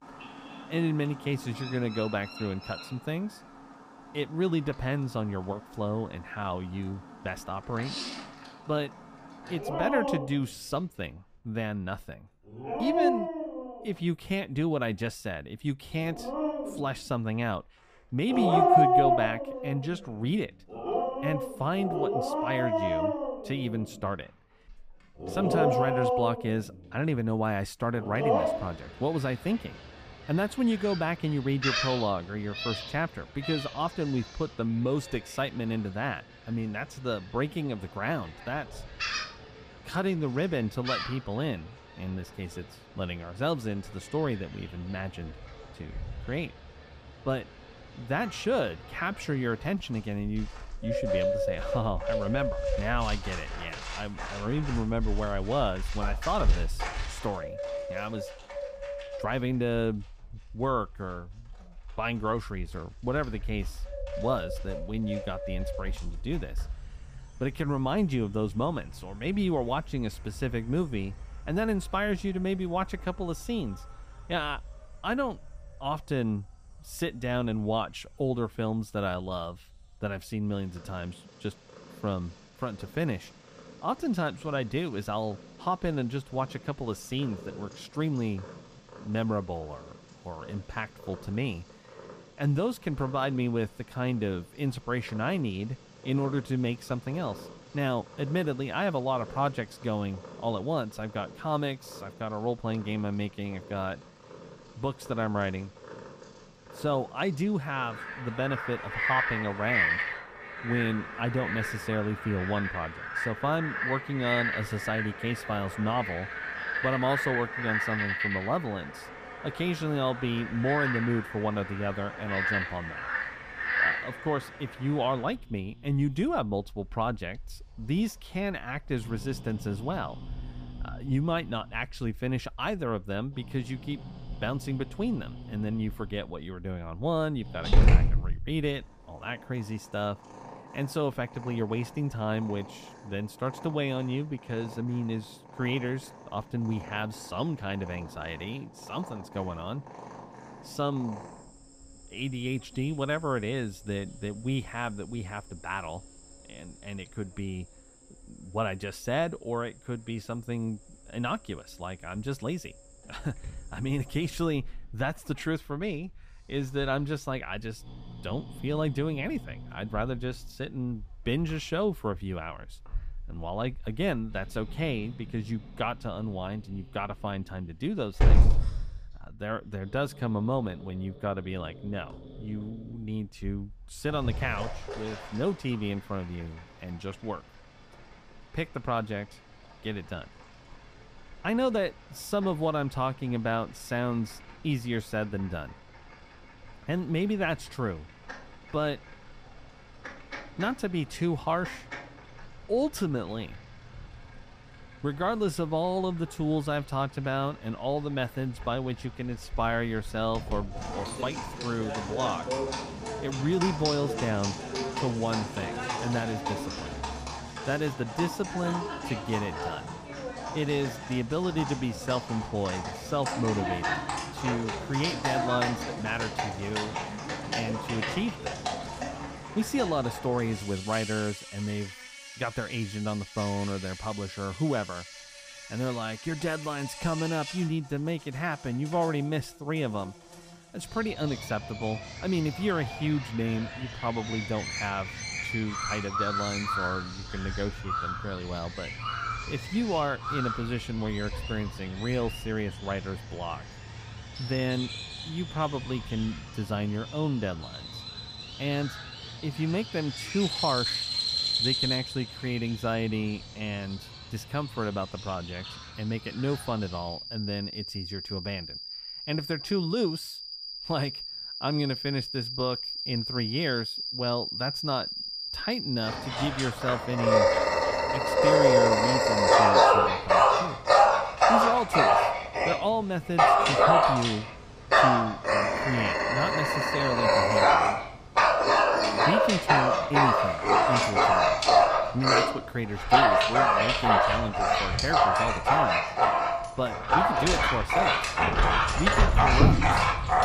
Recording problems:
animal sounds; very loud; throughout; 4 dB above the speech

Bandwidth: 15 kHz